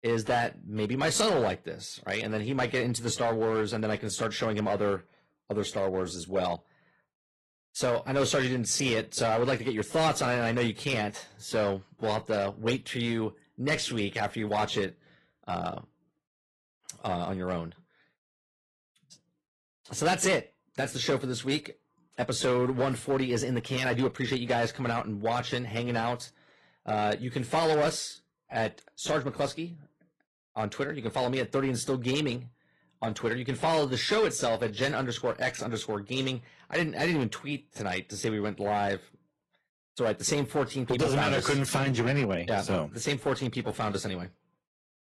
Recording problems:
distortion; slight; 4% of the sound clipped
garbled, watery; slightly; nothing above 11.5 kHz

